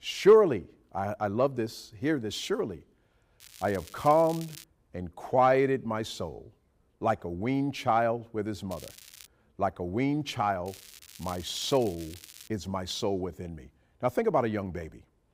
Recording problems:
crackling; noticeable; from 3.5 to 4.5 s, at 8.5 s and from 11 to 12 s; 20 dB below the speech

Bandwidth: 15.5 kHz